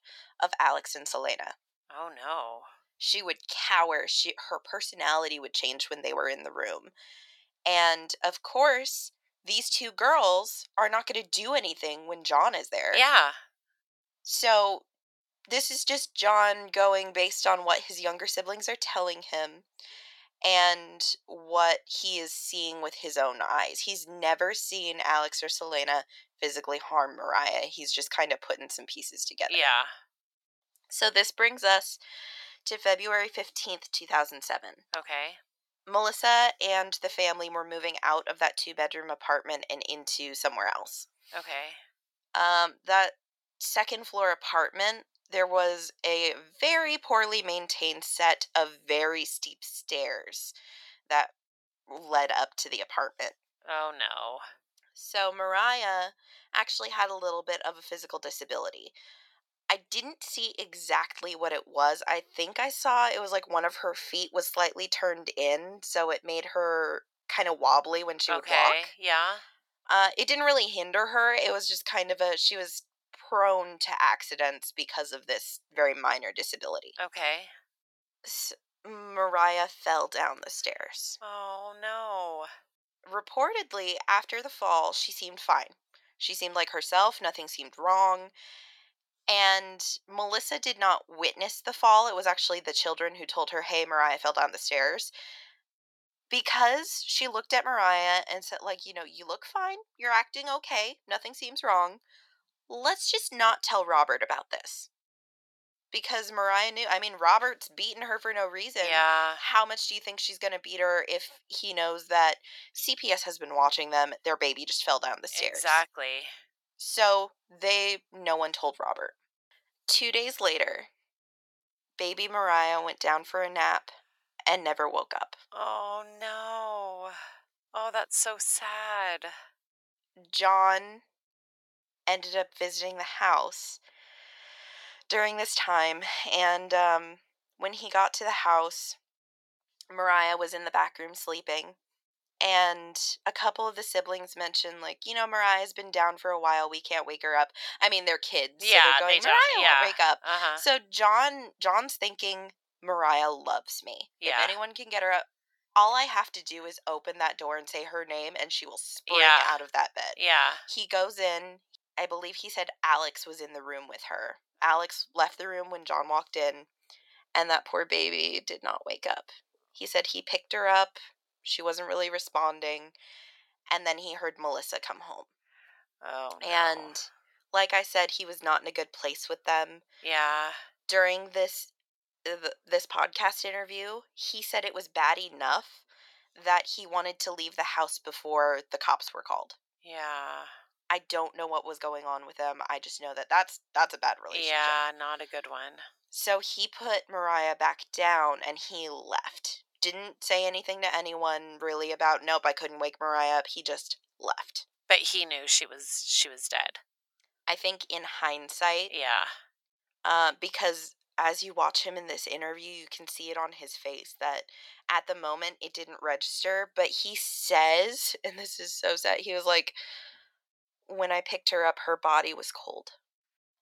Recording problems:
thin; very; fading below 600 Hz

